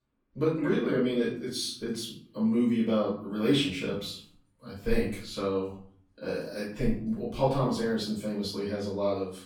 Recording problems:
off-mic speech; far
room echo; noticeable; dies away in 0.5 s

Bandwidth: 18 kHz